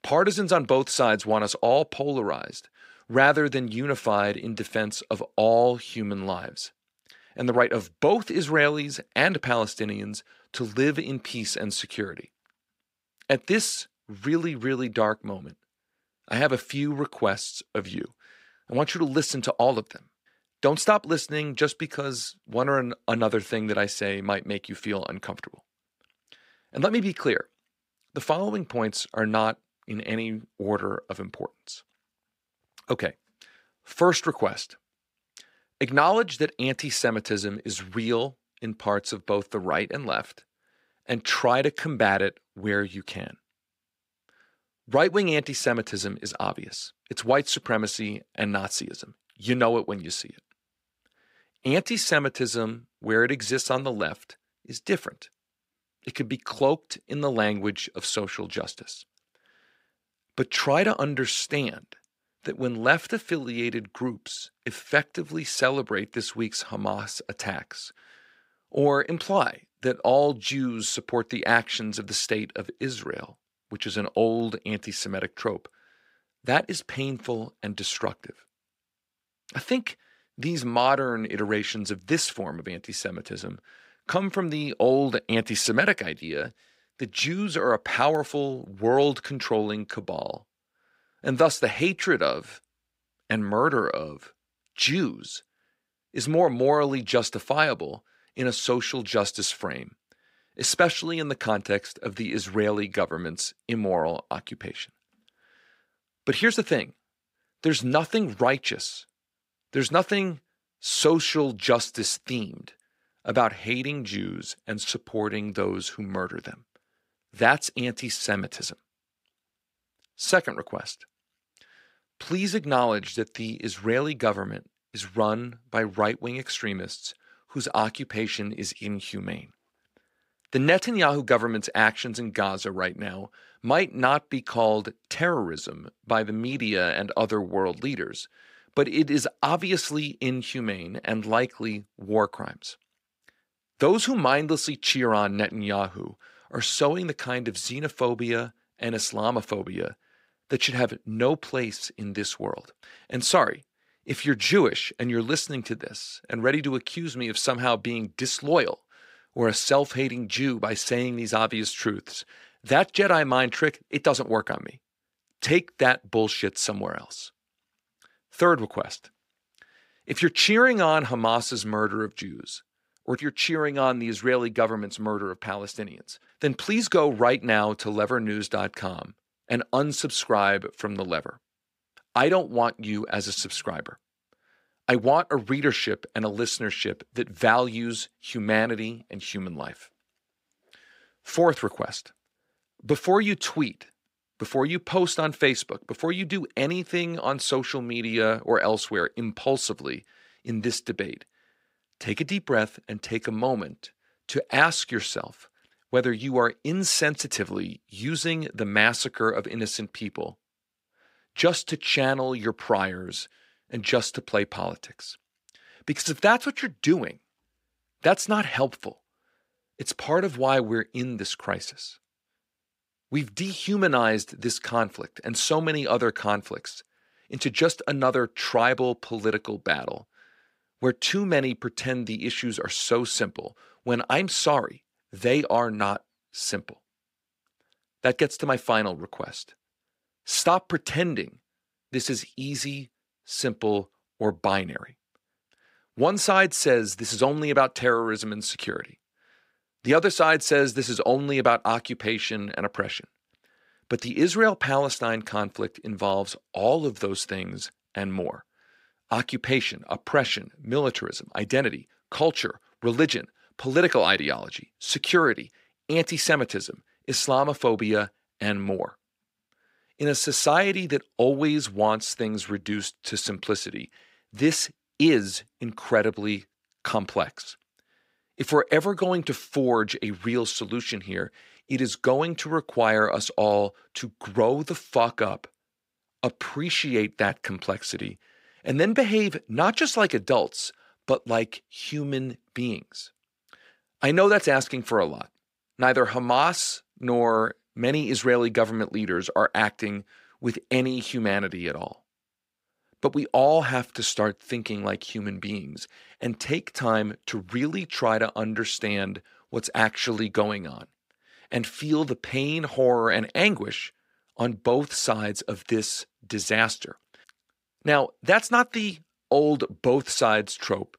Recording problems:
thin; very slightly; fading below 500 Hz

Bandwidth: 15.5 kHz